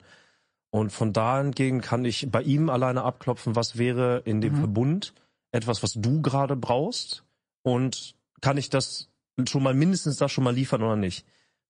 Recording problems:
garbled, watery; slightly; nothing above 9 kHz

